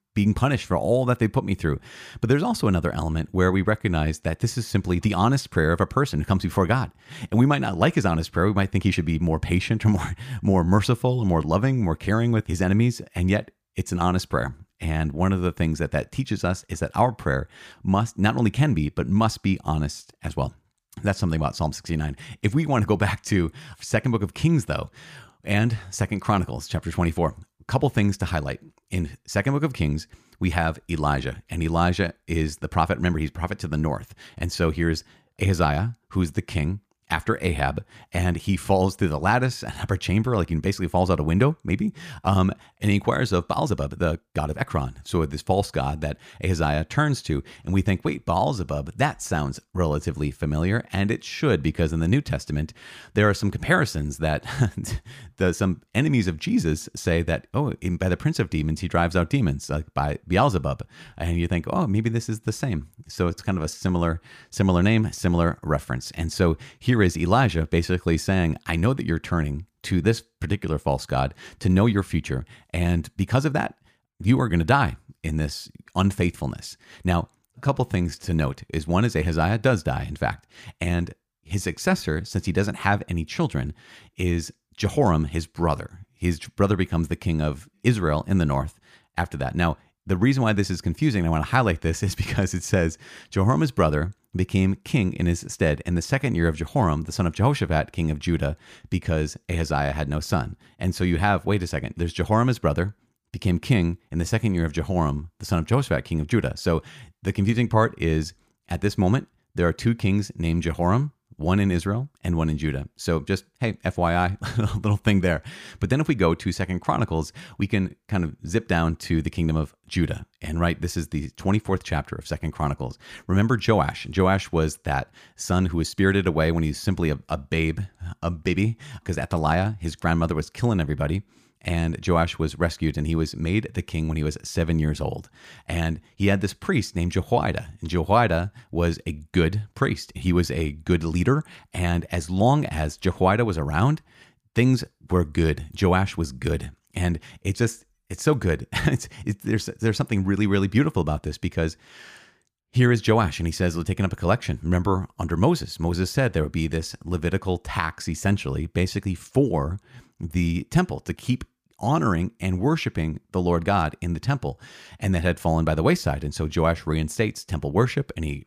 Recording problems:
uneven, jittery; strongly; from 43 s to 2:06

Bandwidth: 15 kHz